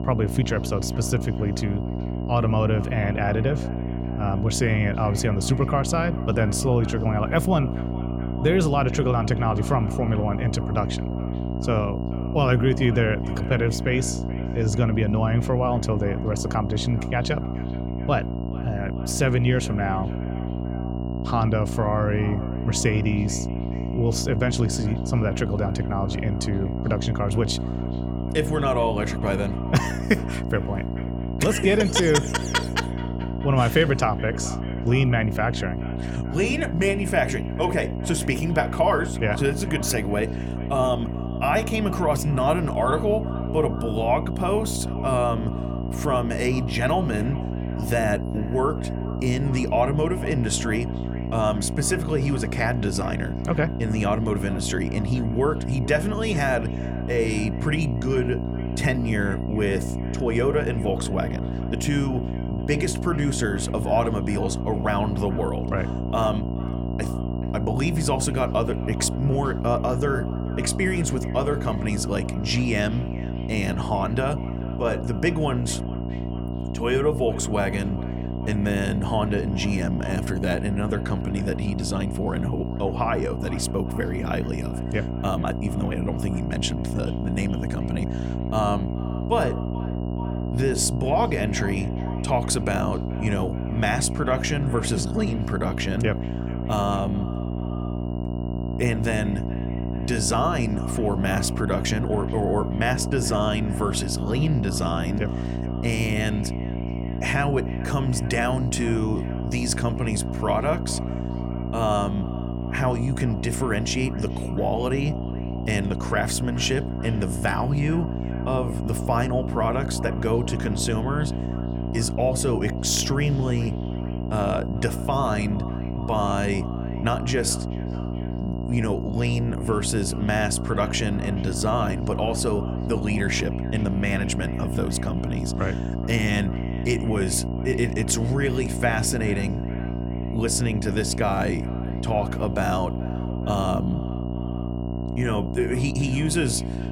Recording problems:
echo of what is said; faint; throughout; 430 ms later, 20 dB below the speech
electrical hum; loud; throughout; 60 Hz, 9 dB below the speech
high-pitched whine; faint; throughout; 3 kHz, 30 dB below the speech

